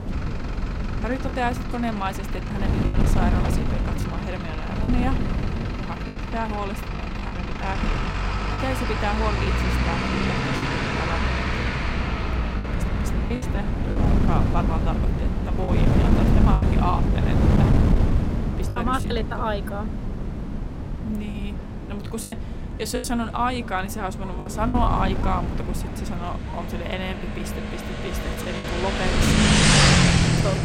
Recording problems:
traffic noise; very loud; throughout; 4 dB above the speech
wind noise on the microphone; heavy; 4 dB below the speech
choppy; very; 6% of the speech affected
abrupt cut into speech; at the end

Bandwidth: 16 kHz